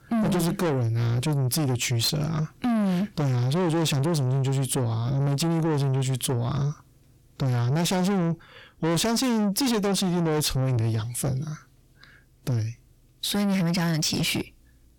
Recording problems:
distortion; heavy; 6 dB below the speech

